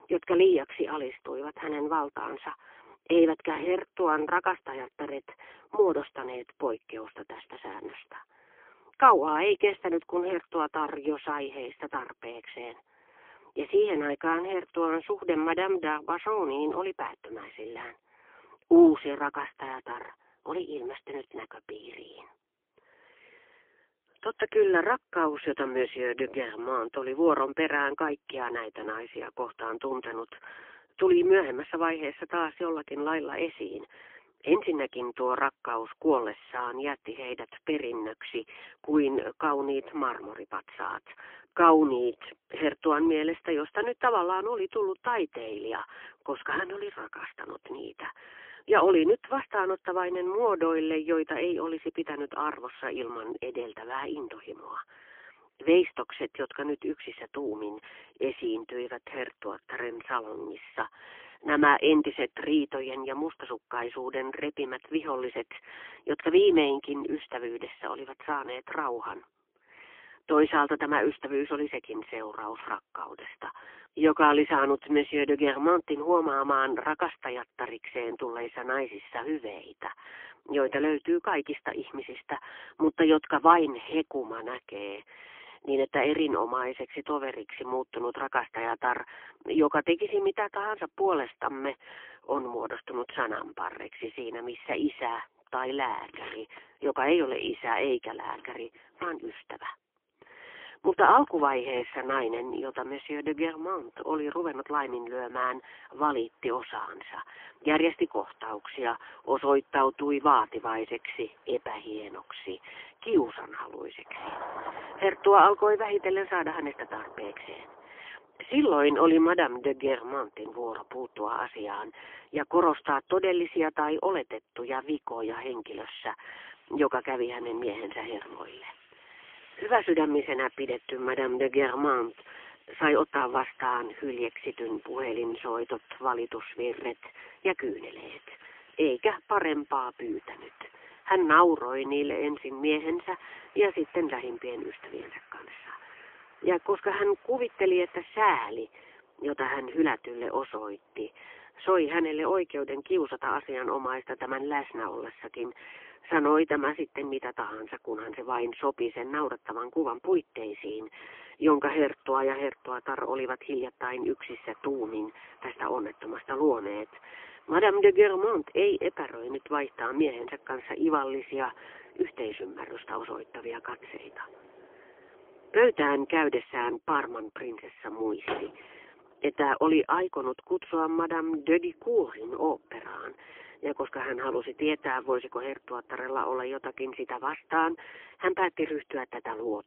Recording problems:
phone-call audio; poor line; nothing above 3.5 kHz
traffic noise; faint; from 1:36 on; 25 dB below the speech

